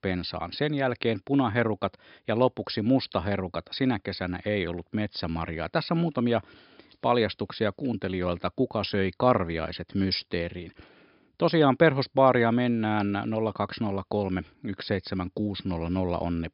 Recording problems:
high frequencies cut off; noticeable; nothing above 5.5 kHz

